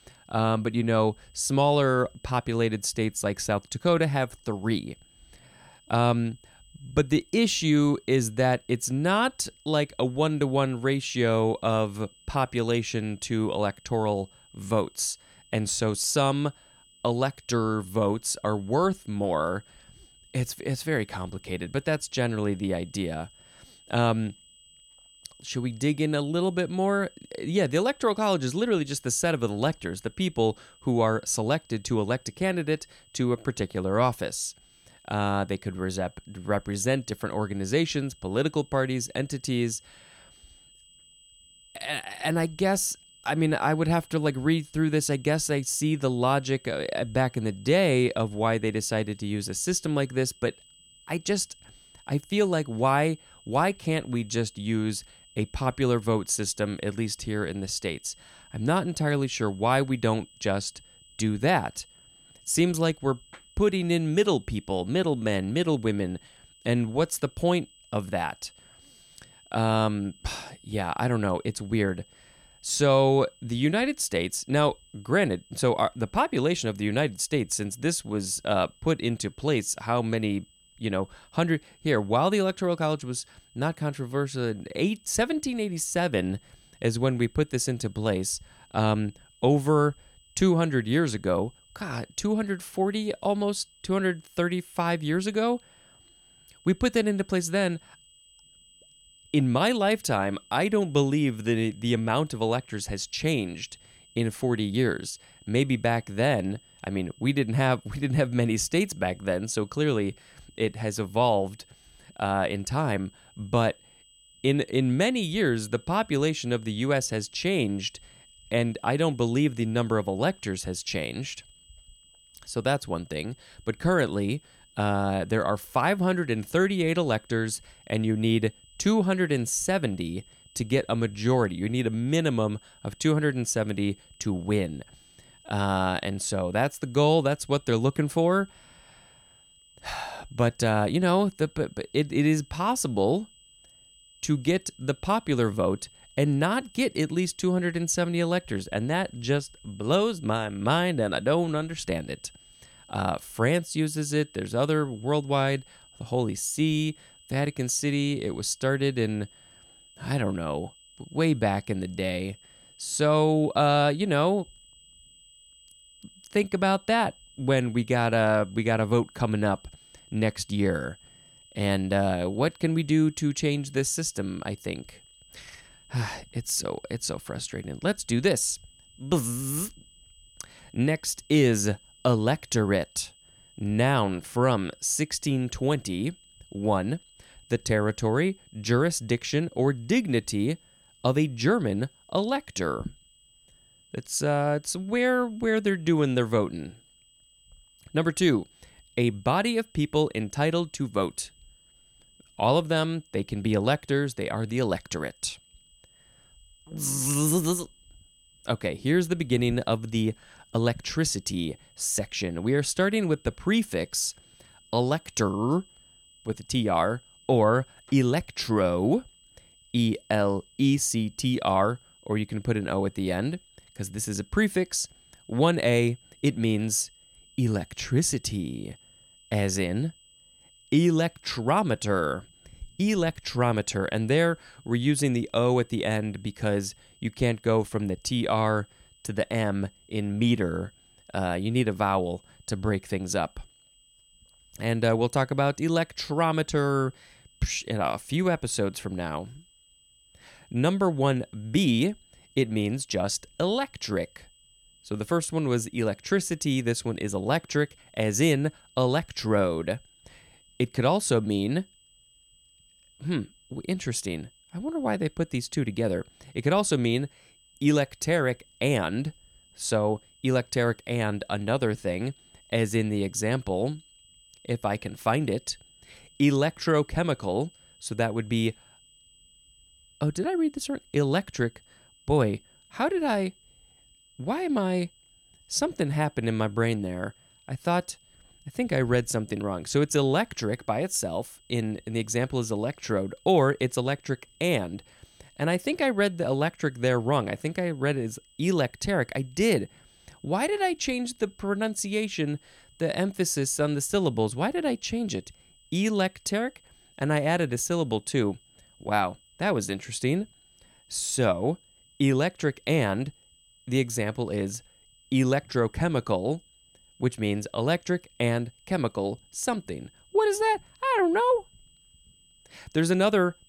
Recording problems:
high-pitched whine; faint; throughout; 3 kHz, 30 dB below the speech

